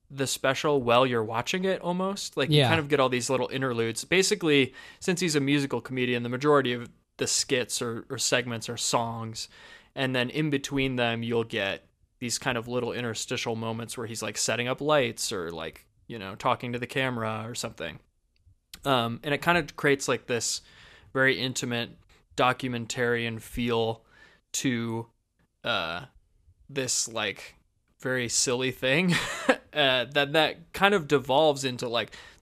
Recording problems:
none

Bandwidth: 14.5 kHz